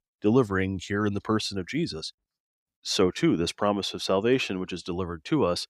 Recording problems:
none

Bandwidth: 15.5 kHz